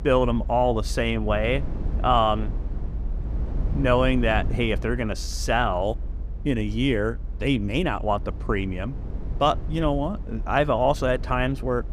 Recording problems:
low rumble; faint; throughout; 20 dB below the speech

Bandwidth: 15.5 kHz